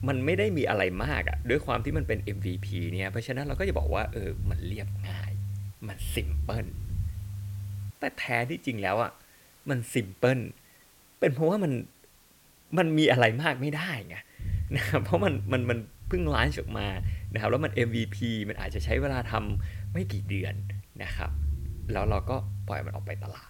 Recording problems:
hiss; faint; throughout; 25 dB below the speech
low rumble; faint; until 8 s and from 14 s on; 20 dB below the speech

